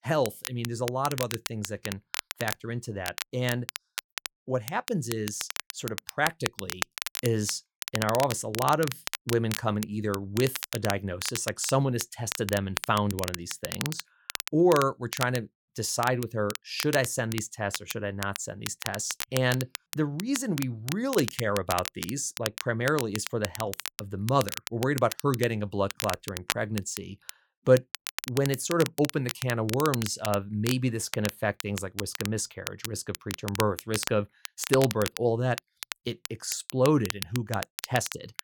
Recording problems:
crackle, like an old record; loud; 7 dB below the speech

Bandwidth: 17.5 kHz